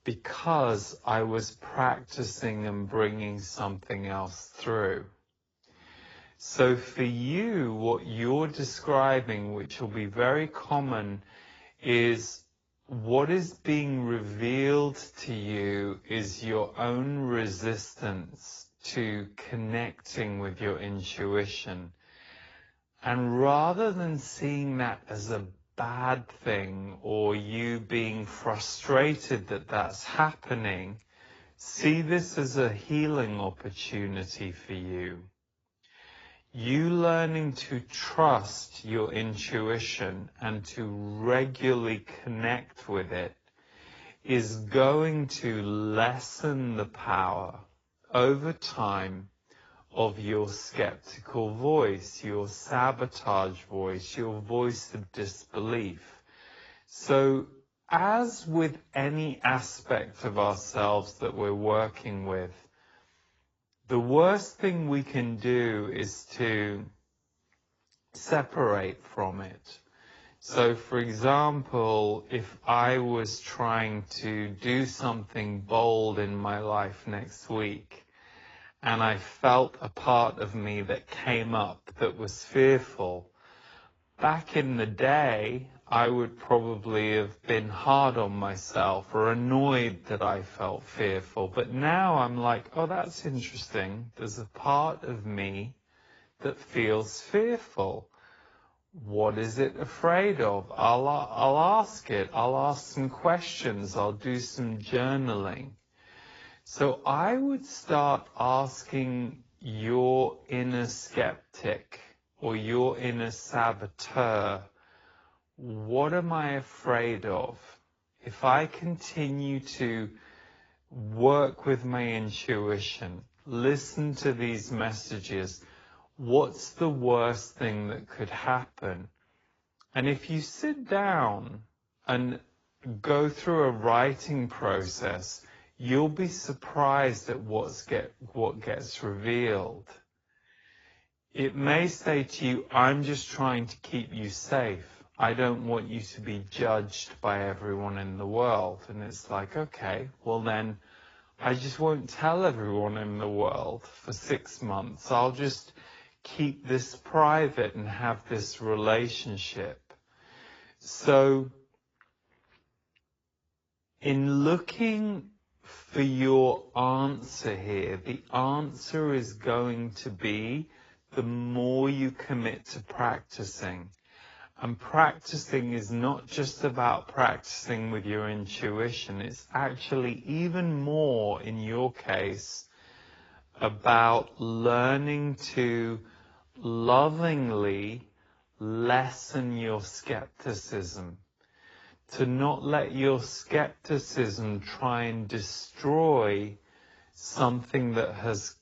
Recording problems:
garbled, watery; badly; nothing above 7.5 kHz
wrong speed, natural pitch; too slow; 0.6 times normal speed

